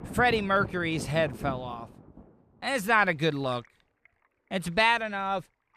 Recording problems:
rain or running water; noticeable; throughout; 15 dB below the speech

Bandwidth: 14.5 kHz